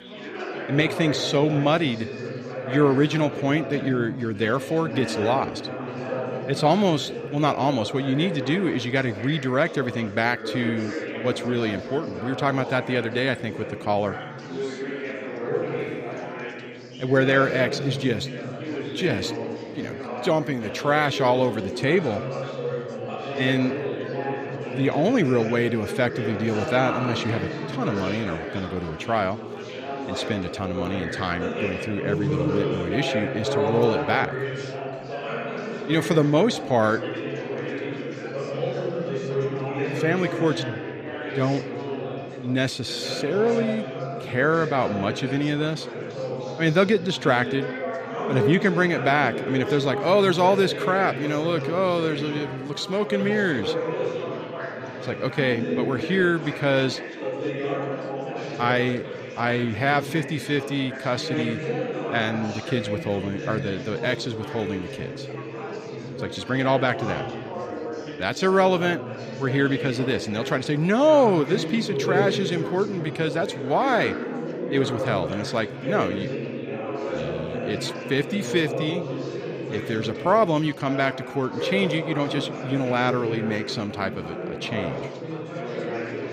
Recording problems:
chatter from many people; loud; throughout; 6 dB below the speech

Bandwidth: 15 kHz